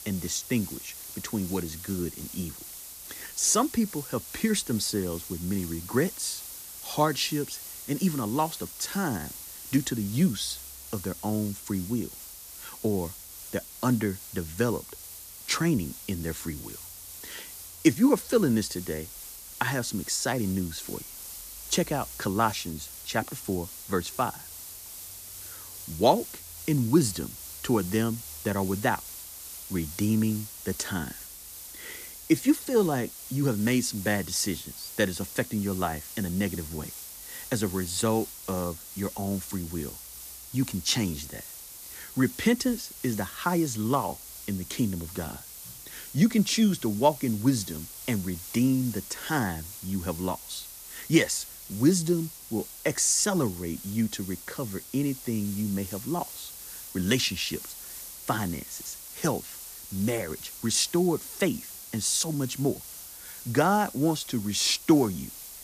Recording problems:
hiss; noticeable; throughout; 10 dB below the speech

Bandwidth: 14.5 kHz